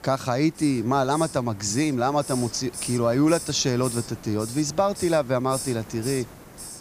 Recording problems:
hiss; noticeable; throughout; 10 dB below the speech

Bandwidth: 15 kHz